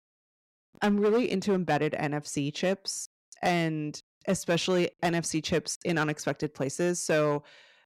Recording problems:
distortion; slight; 5% of the sound clipped

